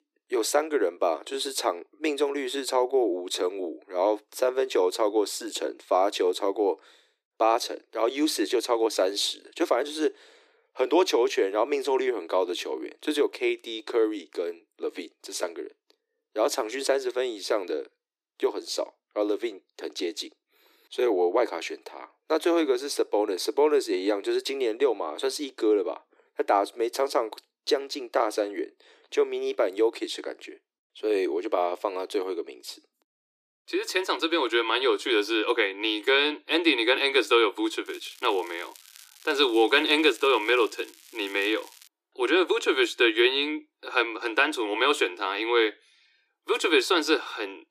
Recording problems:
thin; very; fading below 300 Hz
crackling; faint; from 38 to 42 s; 25 dB below the speech

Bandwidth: 14.5 kHz